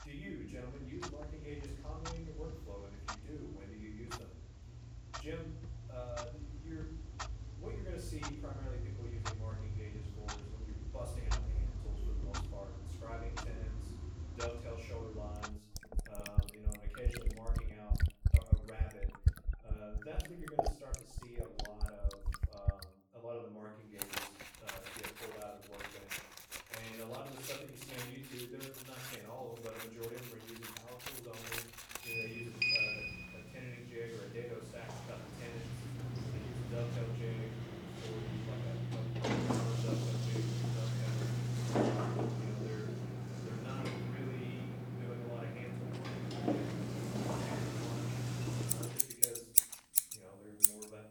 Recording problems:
off-mic speech; far
room echo; noticeable; dies away in 0.6 s
household noises; very loud; throughout; 10 dB above the speech
footsteps; noticeable; from 46 to 50 s; peak 8 dB below the speech

